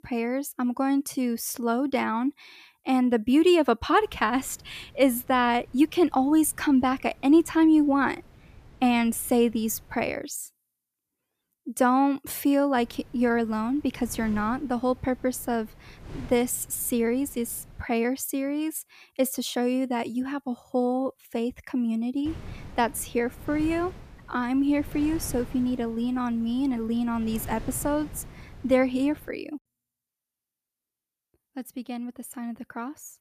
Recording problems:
wind noise on the microphone; occasional gusts; from 4 to 10 s, from 13 to 18 s and from 22 to 29 s; 25 dB below the speech

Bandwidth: 14.5 kHz